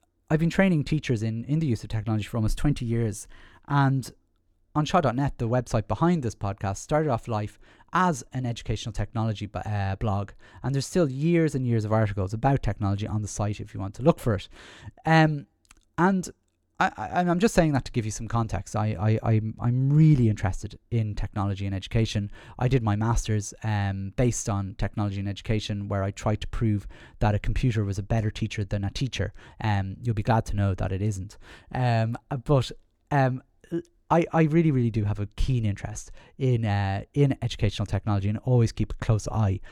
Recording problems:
none

